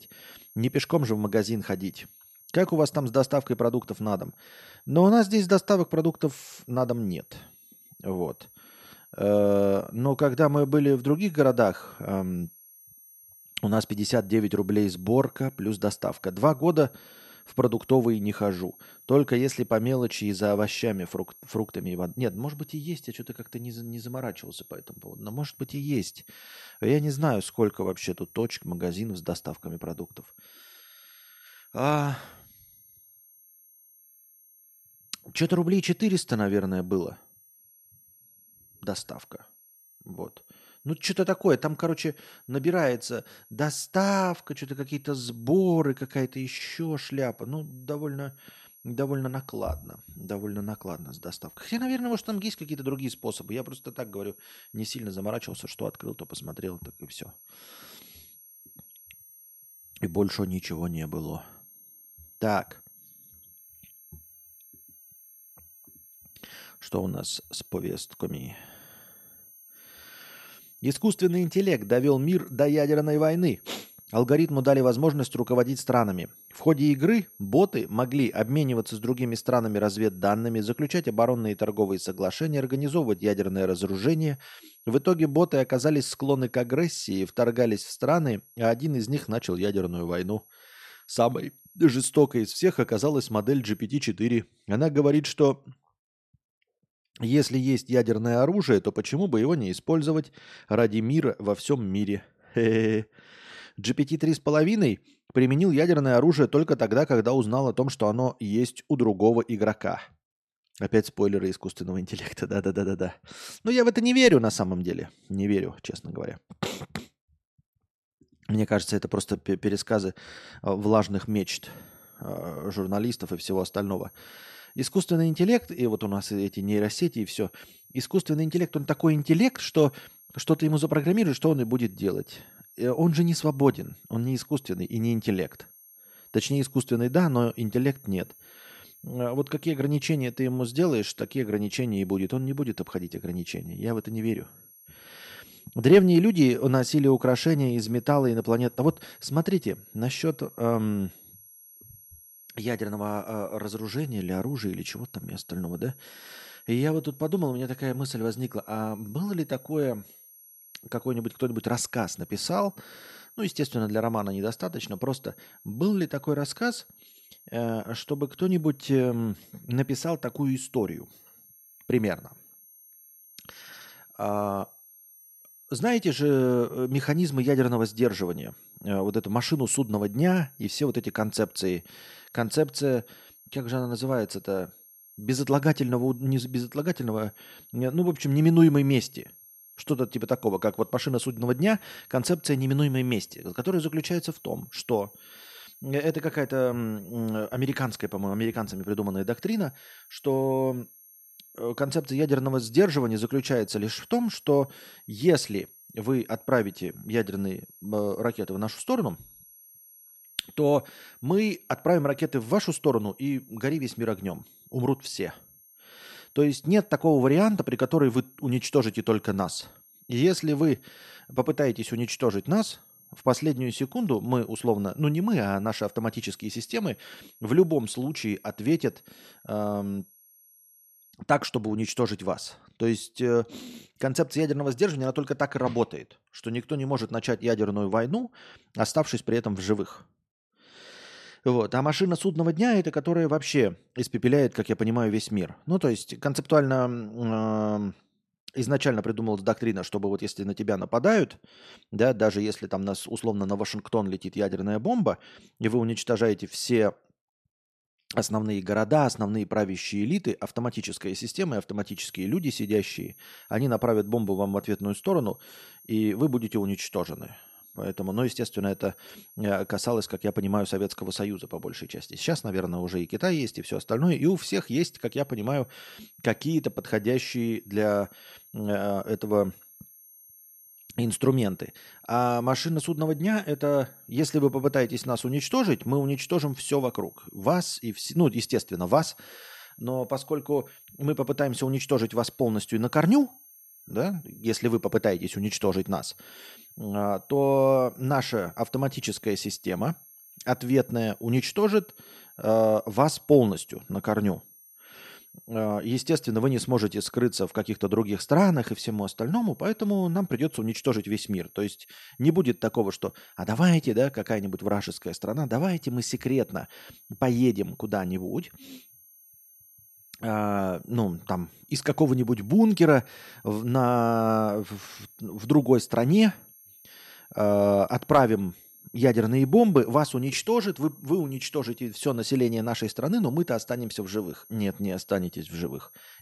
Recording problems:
high-pitched whine; faint; until 1:34, from 2:01 to 3:51 and from 4:22 on; 11.5 kHz, 25 dB below the speech

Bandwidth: 13.5 kHz